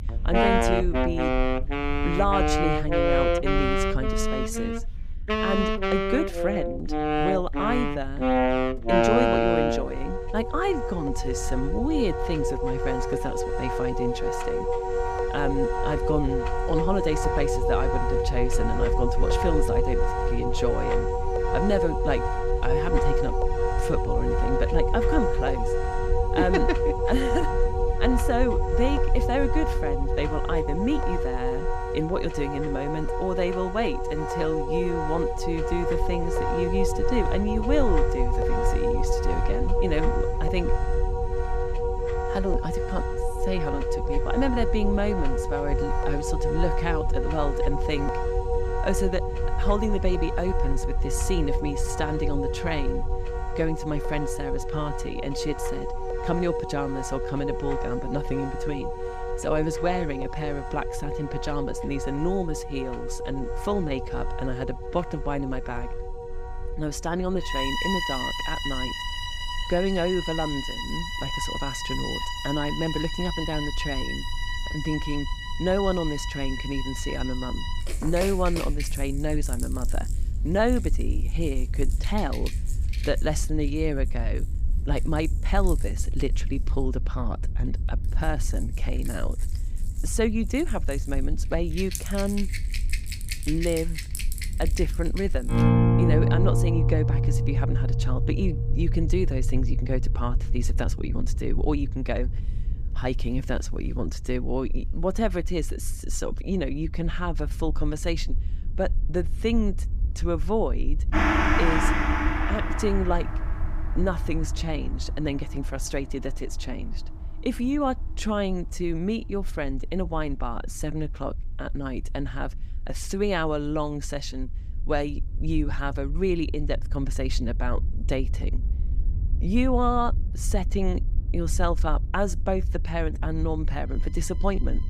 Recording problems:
background music; very loud; throughout; 1 dB above the speech
low rumble; faint; throughout; 20 dB below the speech

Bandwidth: 15.5 kHz